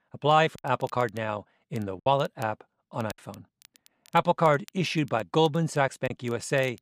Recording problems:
crackle, like an old record; faint; 25 dB below the speech
choppy; occasionally; 4% of the speech affected

